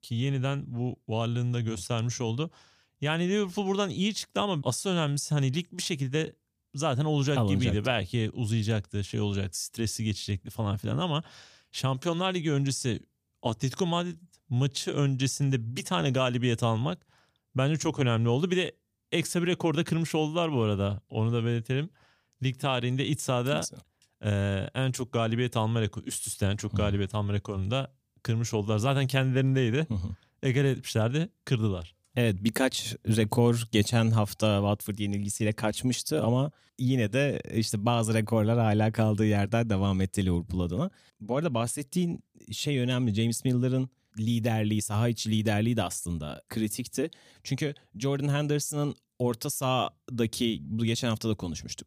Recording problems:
none

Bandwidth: 15 kHz